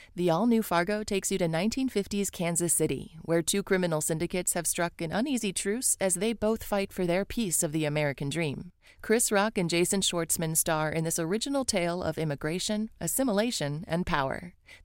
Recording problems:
none

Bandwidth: 16 kHz